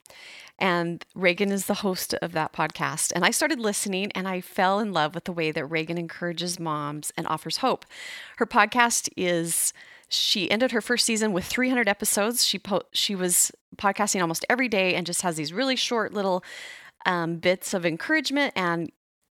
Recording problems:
uneven, jittery; strongly; from 1.5 to 18 s

